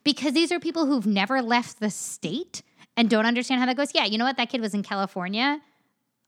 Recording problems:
none

